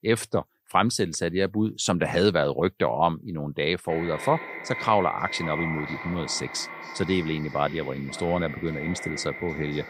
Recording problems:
echo of what is said; strong; from 4 s on; 530 ms later, 9 dB below the speech

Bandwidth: 15.5 kHz